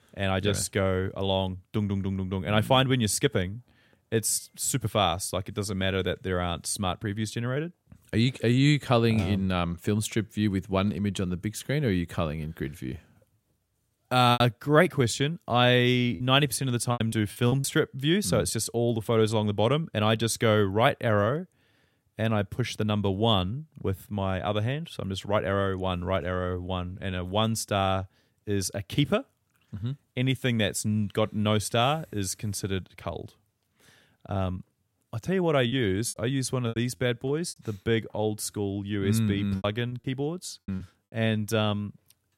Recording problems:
choppy; very; from 14 to 18 s, from 36 to 38 s and from 40 to 41 s; 13% of the speech affected

